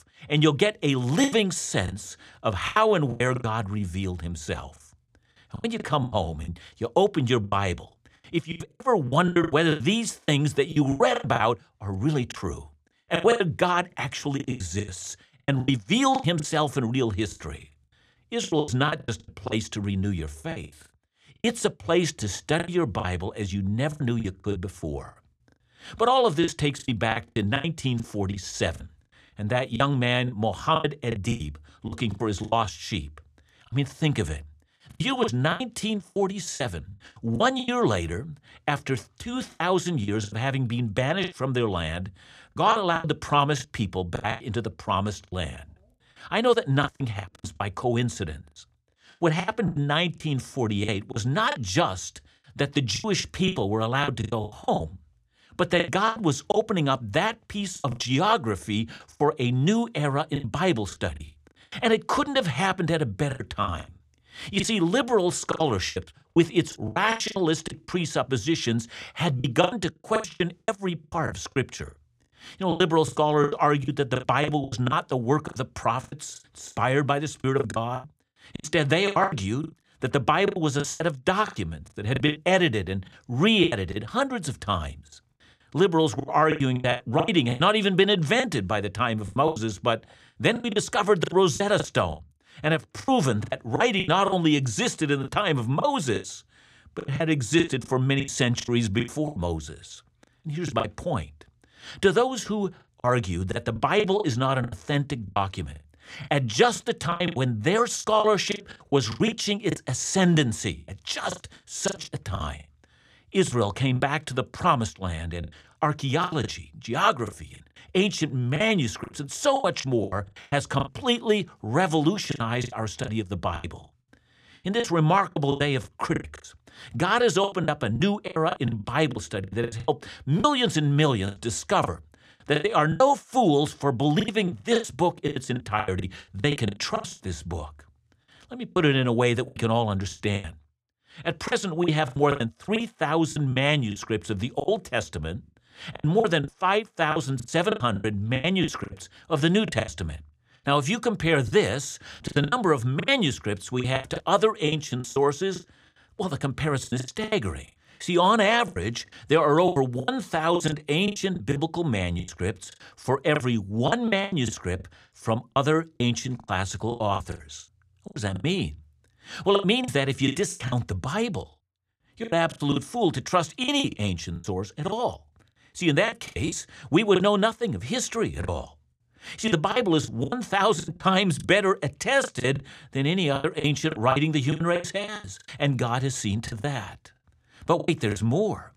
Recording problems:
choppy; very; 15% of the speech affected

